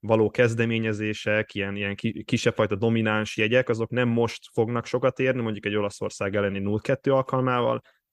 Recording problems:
none

